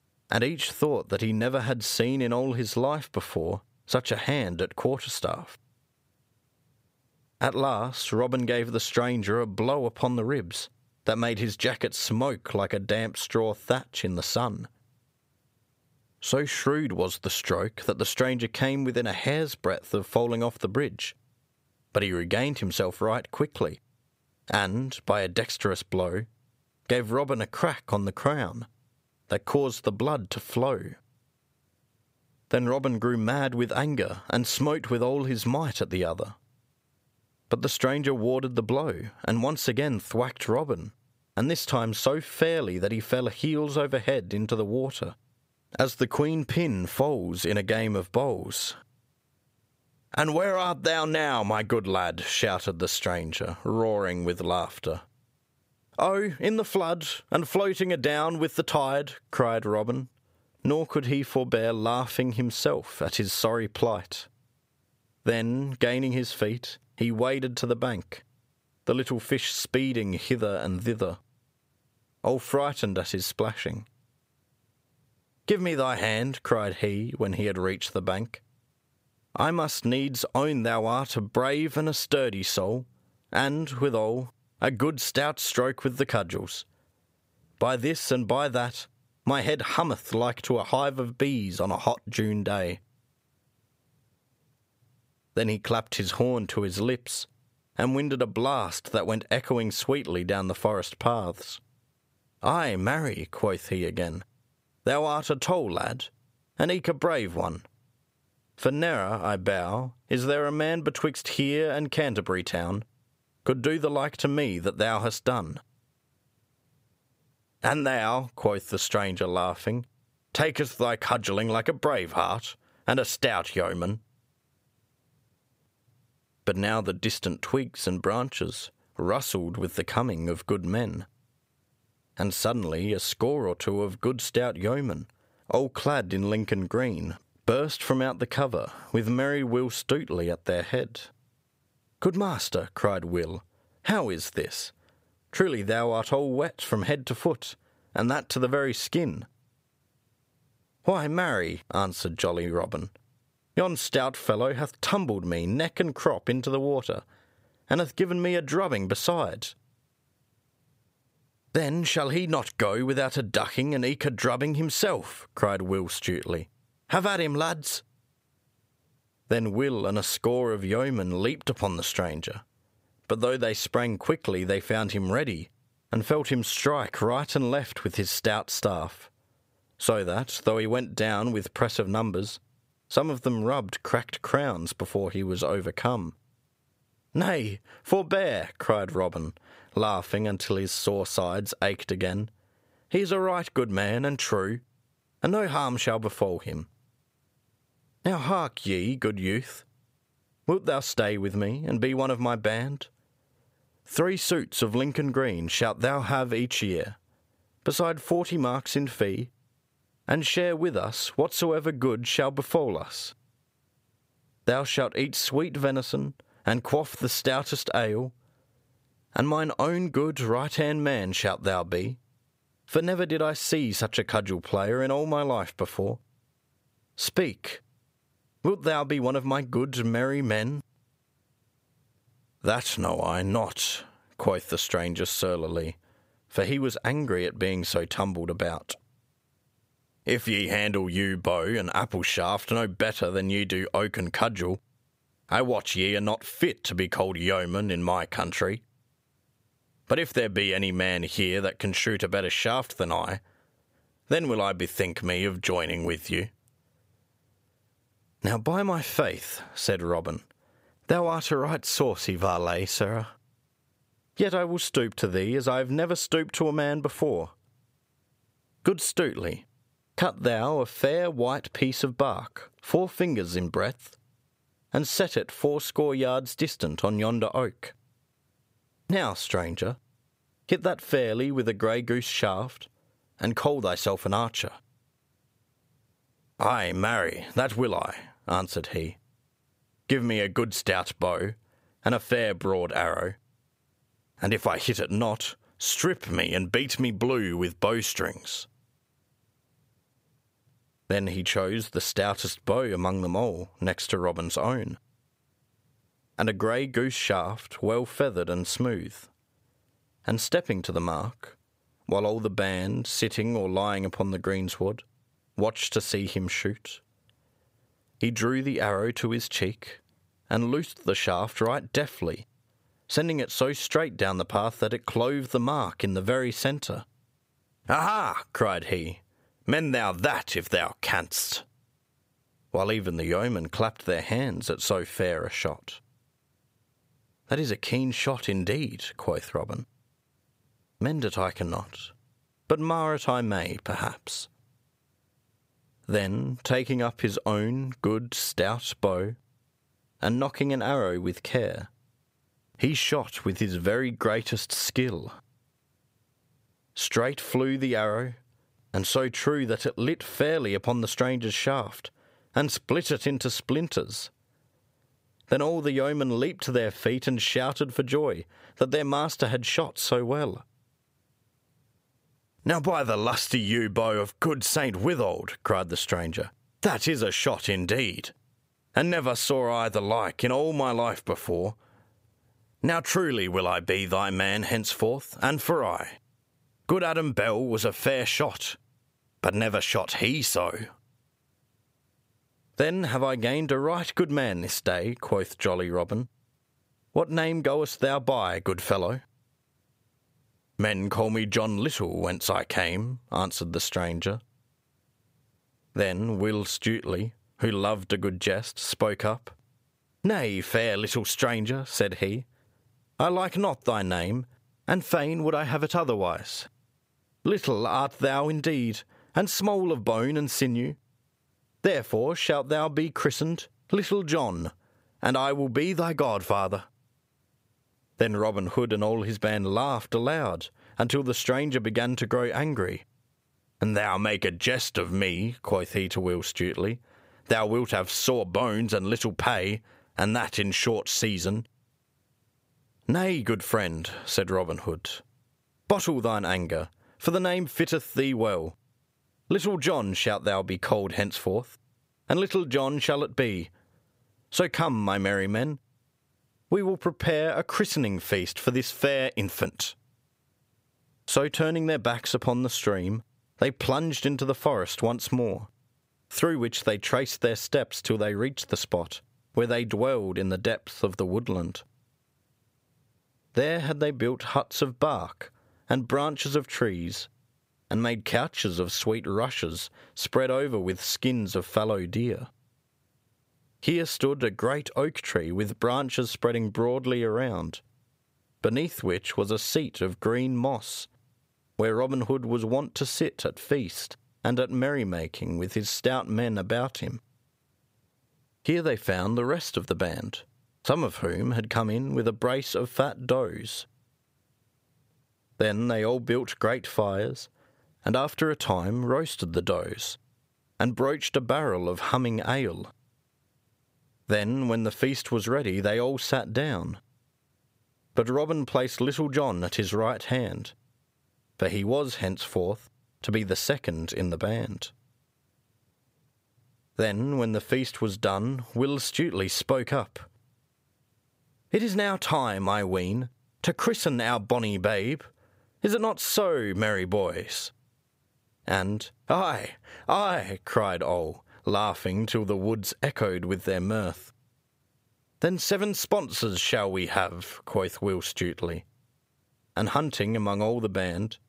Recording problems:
squashed, flat; somewhat

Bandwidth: 15.5 kHz